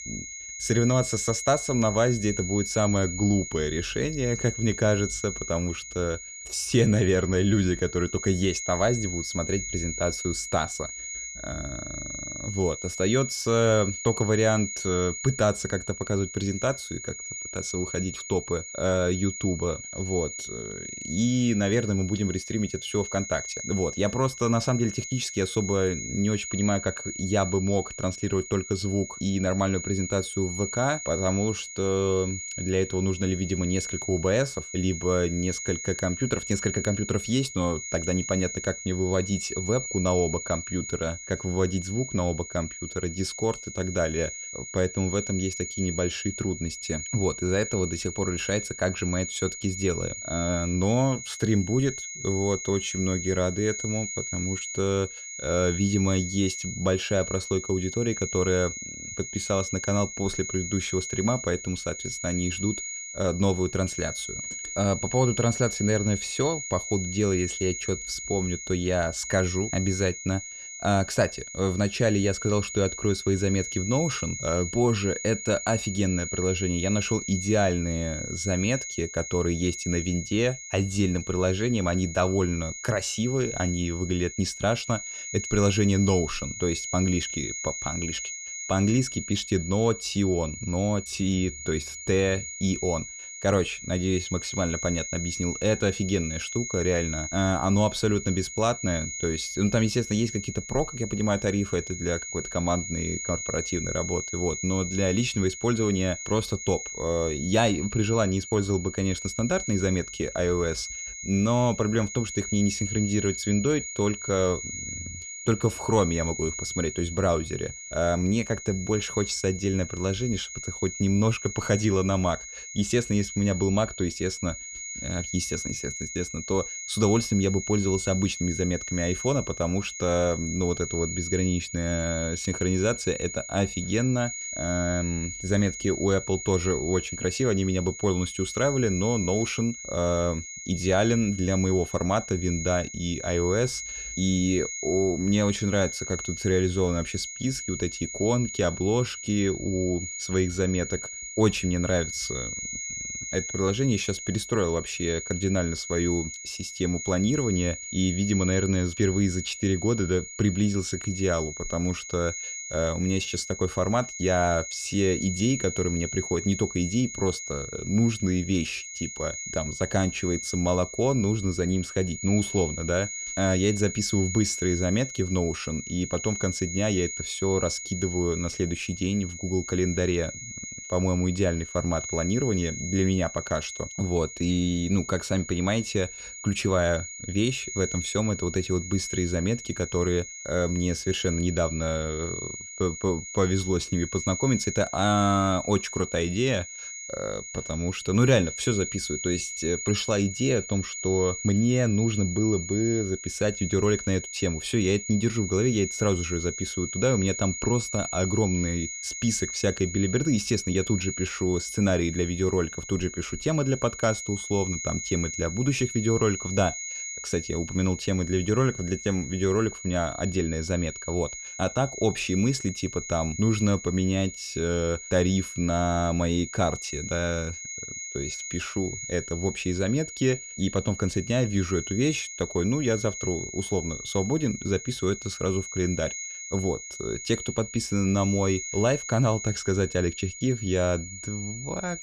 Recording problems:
high-pitched whine; loud; throughout; 6.5 kHz, 7 dB below the speech

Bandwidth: 14.5 kHz